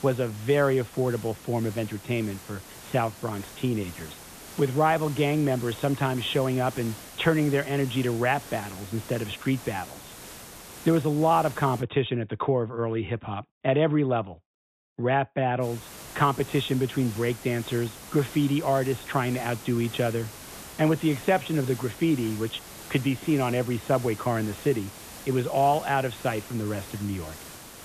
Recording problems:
high frequencies cut off; severe; nothing above 4 kHz
hiss; noticeable; until 12 s and from 16 s on; 15 dB below the speech

